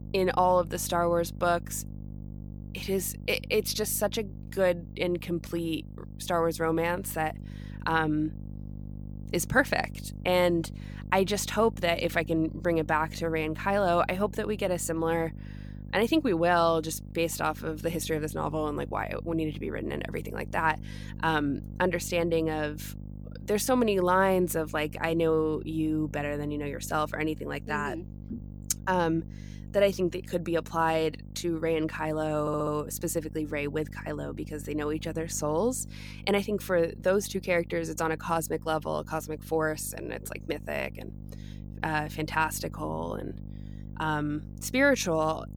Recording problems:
electrical hum; faint; throughout; 50 Hz, 25 dB below the speech
audio stuttering; at 32 s

